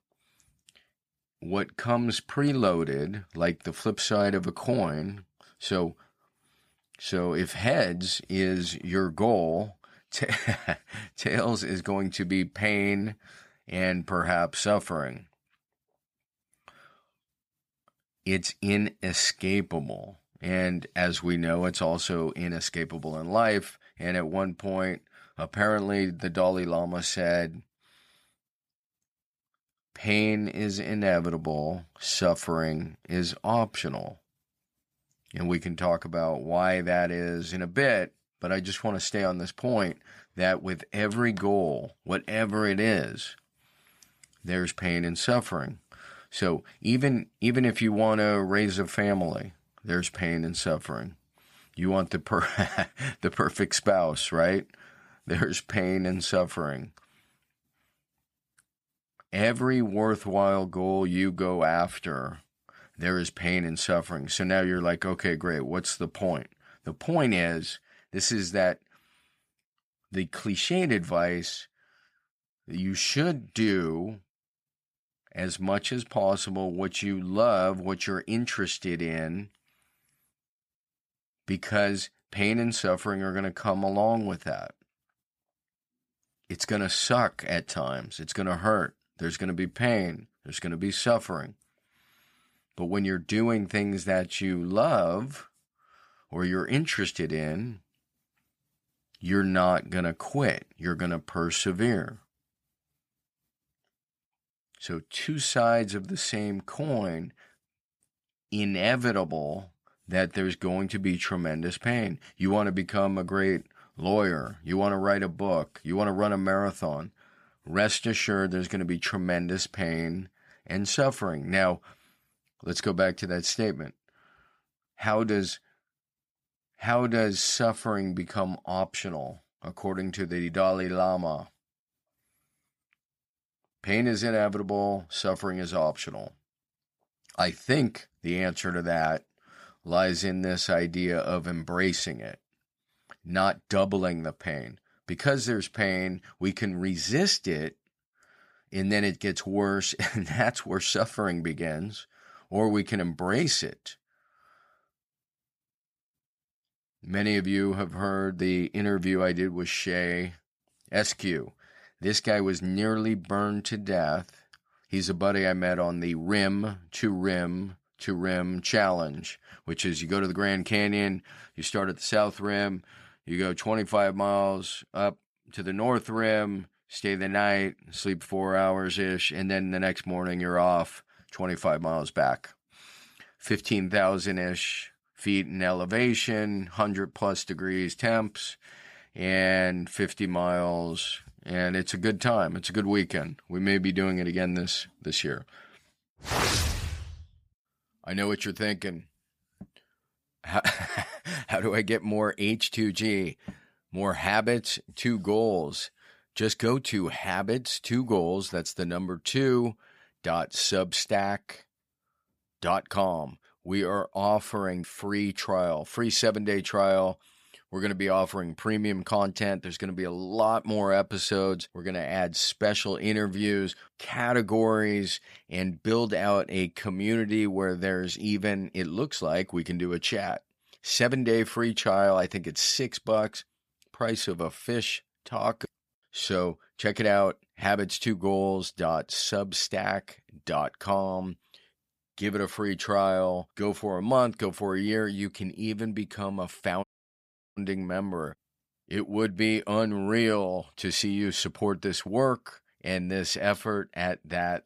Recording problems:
audio cutting out; at 4:07 for 0.5 s

